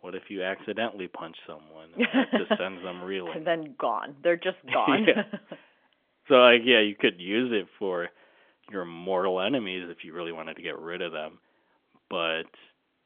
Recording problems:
phone-call audio; nothing above 3.5 kHz

